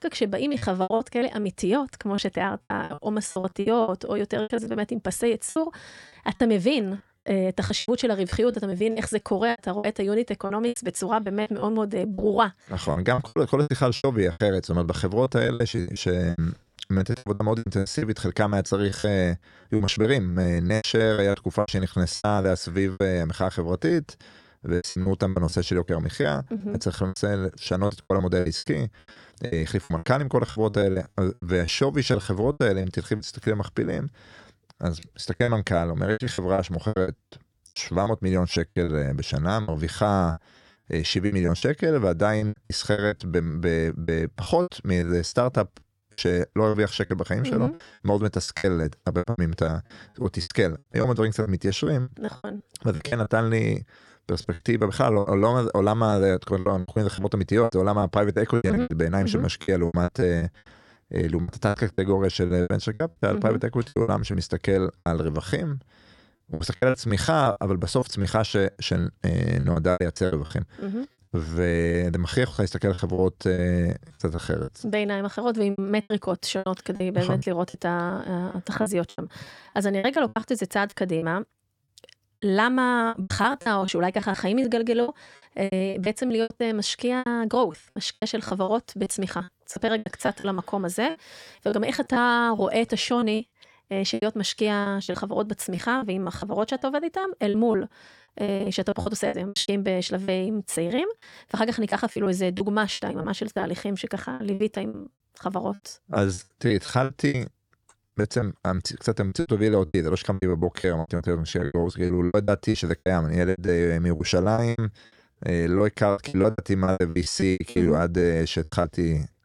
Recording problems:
choppy; very; 15% of the speech affected

